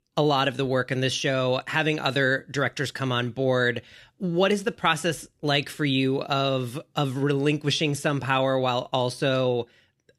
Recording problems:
none

